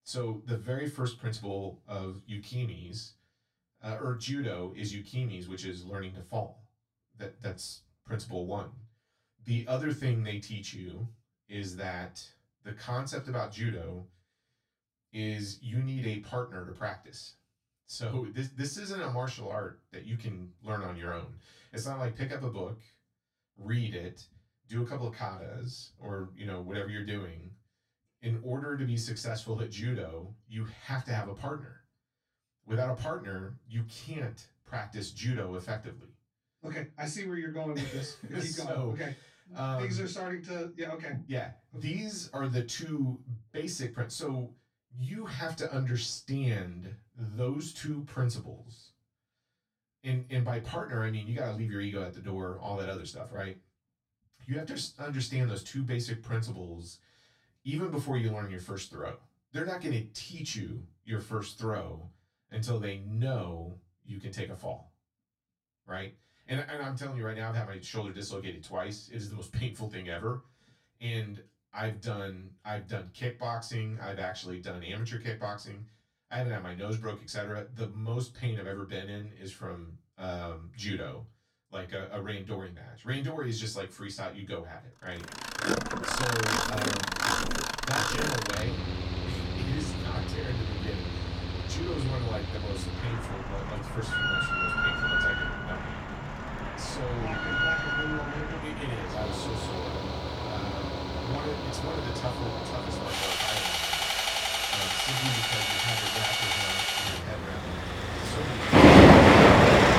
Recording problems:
off-mic speech; far
room echo; very slight; dies away in 0.2 s
machinery noise; very loud; from 1:26 on; 10 dB above the speech

